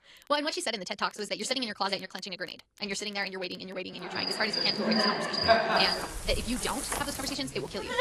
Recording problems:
wrong speed, natural pitch; too fast; 1.7 times normal speed
garbled, watery; slightly; nothing above 11.5 kHz
animal sounds; very loud; from 4 s on; 4 dB above the speech
crackle, like an old record; faint; 25 dB below the speech

